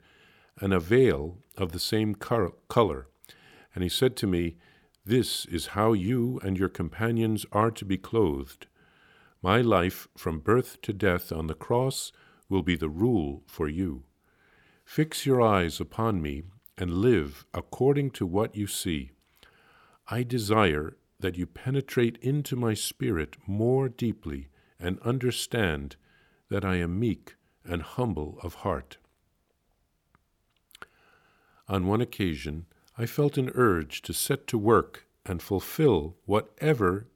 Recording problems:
none

